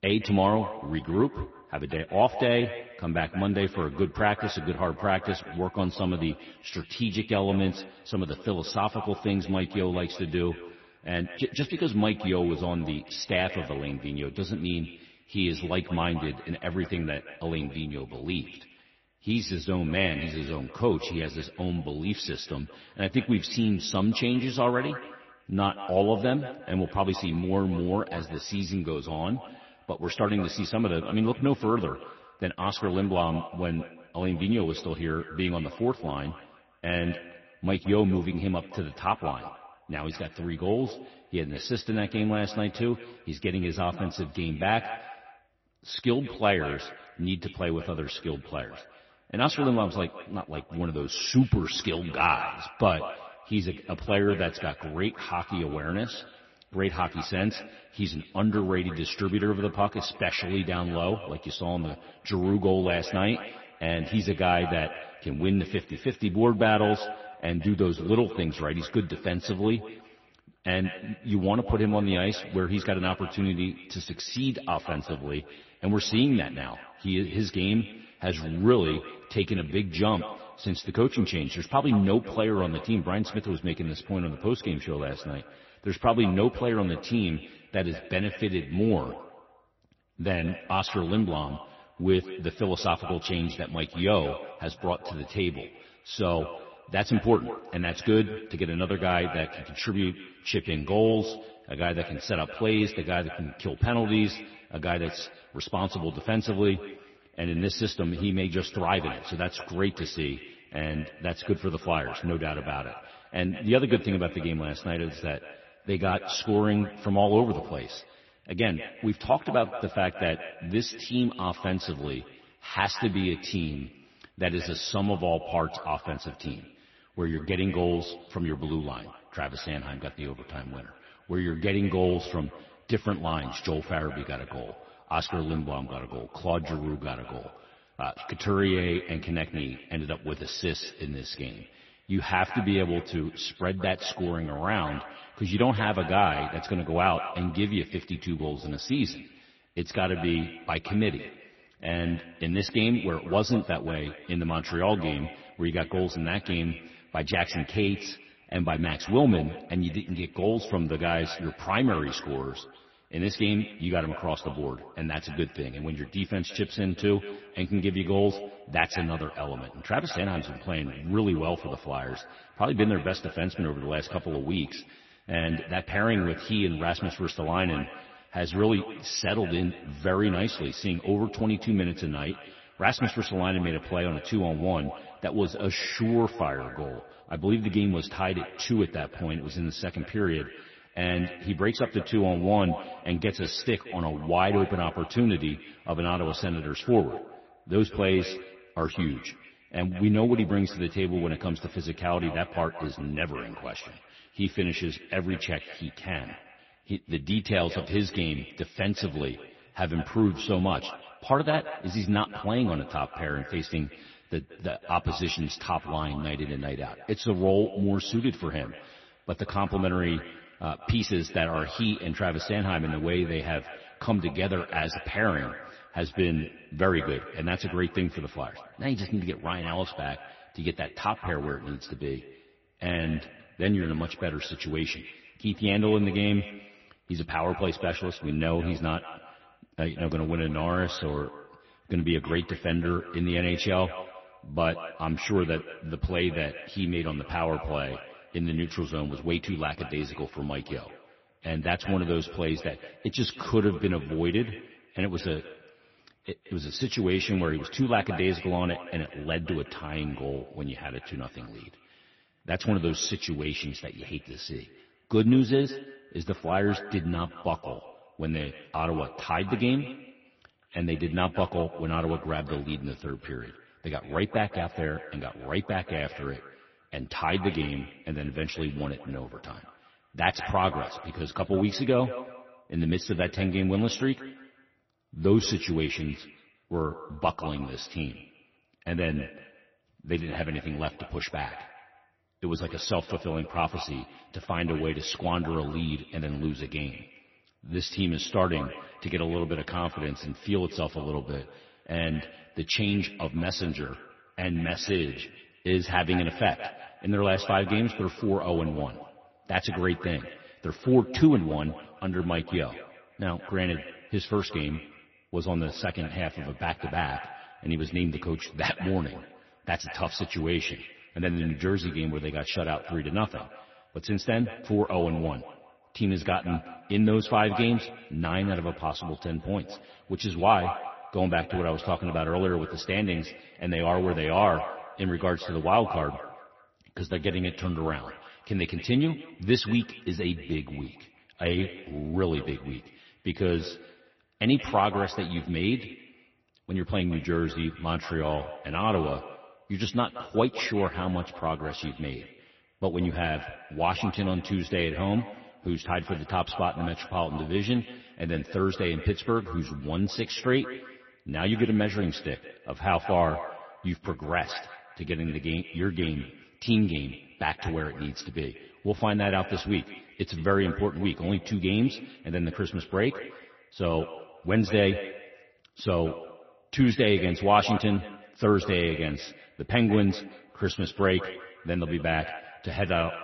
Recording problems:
echo of what is said; noticeable; throughout; 180 ms later, 15 dB below the speech
garbled, watery; slightly; nothing above 6 kHz

